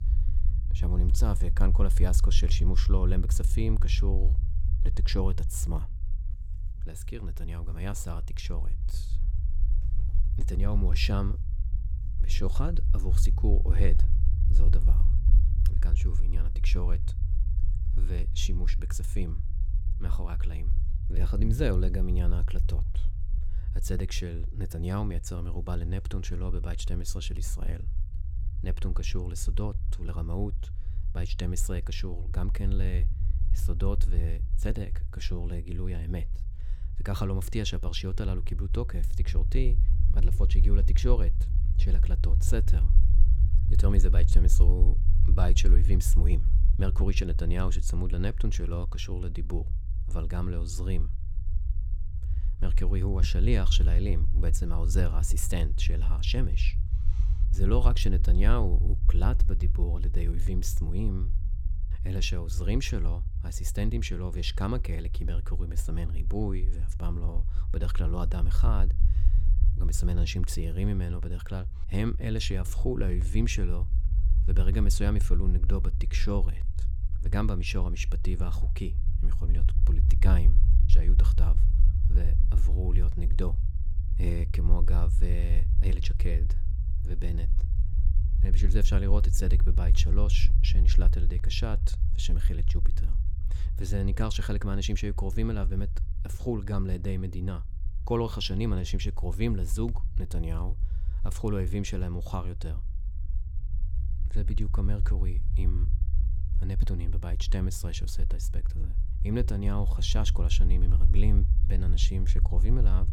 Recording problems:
low rumble; noticeable; throughout; 10 dB below the speech

